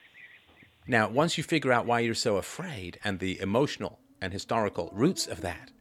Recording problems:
animal sounds; faint; throughout; 25 dB below the speech

